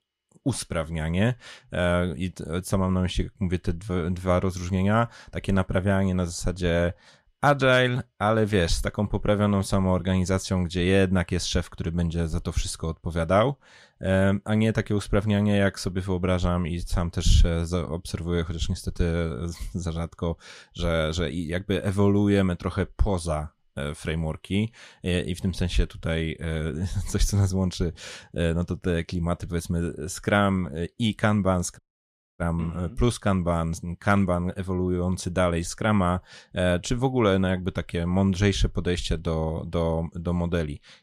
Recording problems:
audio cutting out; at 32 s for 0.5 s

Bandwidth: 15 kHz